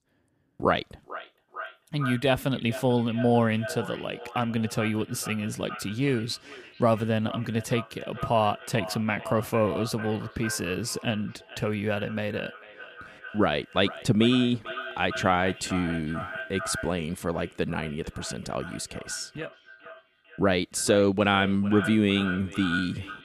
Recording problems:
echo of what is said; noticeable; throughout; 440 ms later, 10 dB below the speech

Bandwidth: 15 kHz